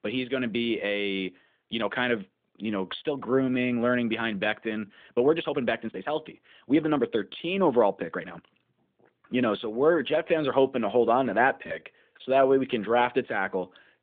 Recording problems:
phone-call audio; nothing above 3.5 kHz
uneven, jittery; strongly; from 1.5 to 13 s

